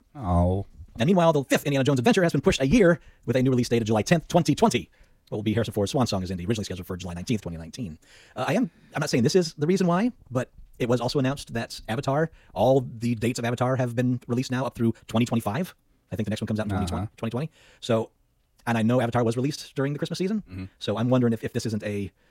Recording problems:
wrong speed, natural pitch; too fast; 1.7 times normal speed

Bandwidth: 16 kHz